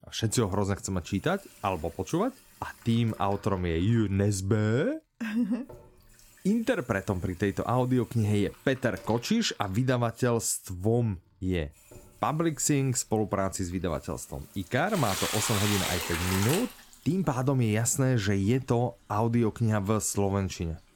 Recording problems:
household noises; loud; throughout; 4 dB below the speech

